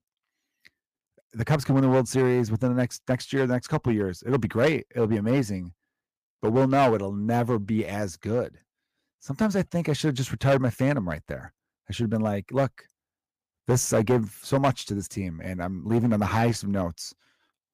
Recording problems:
distortion; slight; 4% of the sound clipped

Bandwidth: 15 kHz